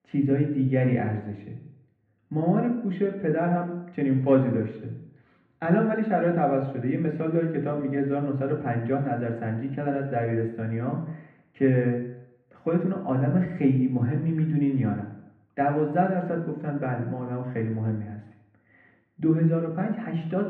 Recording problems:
off-mic speech; far
muffled; very; fading above 3 kHz
room echo; noticeable; dies away in 0.7 s

